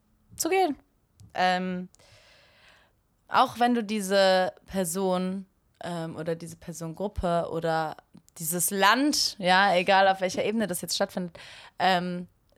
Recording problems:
none

